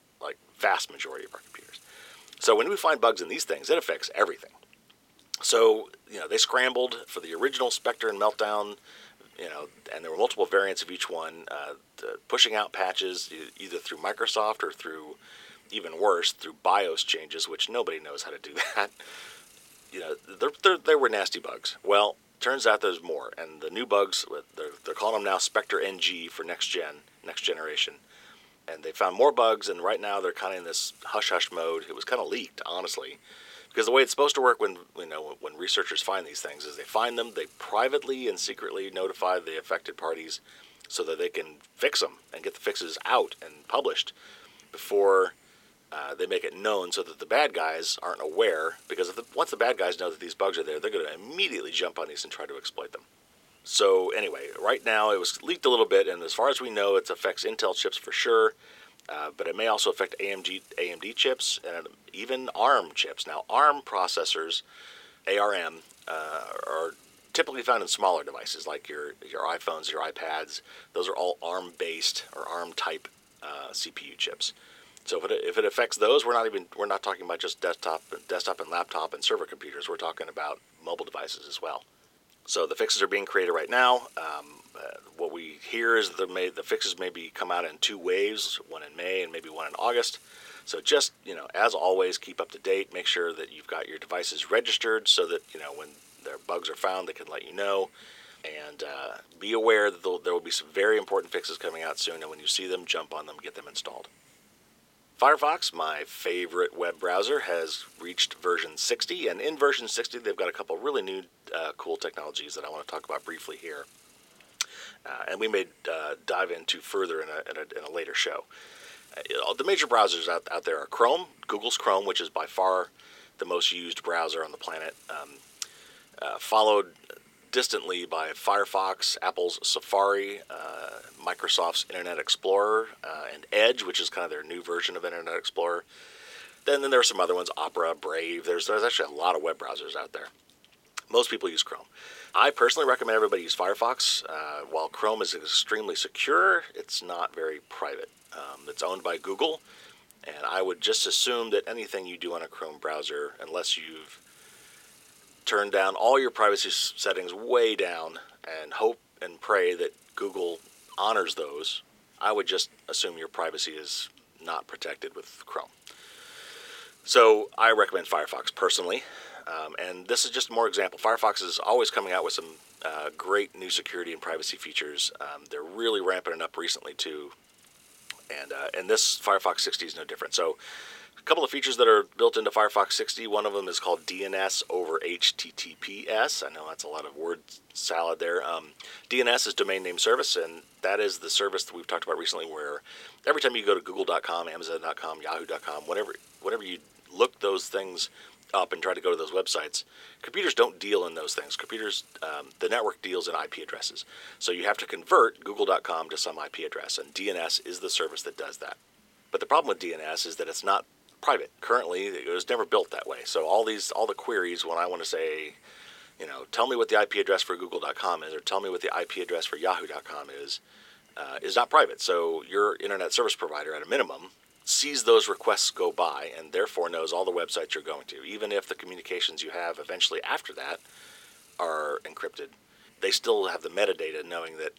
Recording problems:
thin; very; fading below 400 Hz
hiss; faint; throughout; 30 dB below the speech

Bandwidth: 16.5 kHz